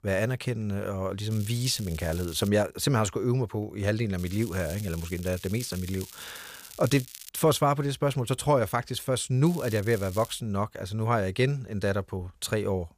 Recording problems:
crackling; noticeable; from 1.5 to 2.5 s, from 4 to 7.5 s and at 9.5 s; 15 dB below the speech

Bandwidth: 15 kHz